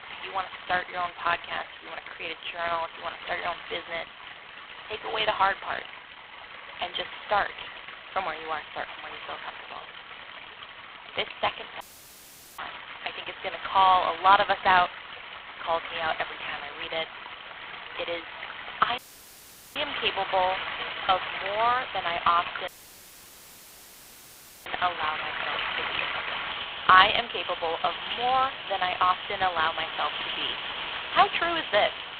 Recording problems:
phone-call audio; poor line; nothing above 3.5 kHz
thin; very; fading below 800 Hz
rain or running water; loud; throughout; 8 dB below the speech
audio cutting out; at 12 s for 1 s, at 19 s for 1 s and at 23 s for 2 s

